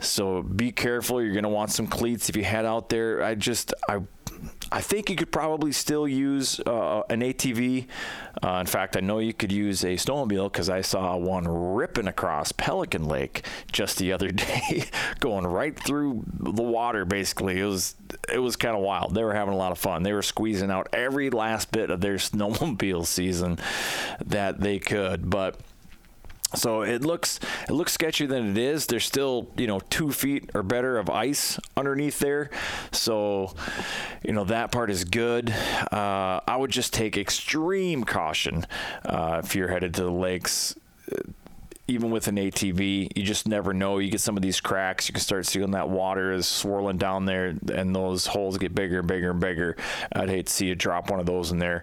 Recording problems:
squashed, flat; heavily

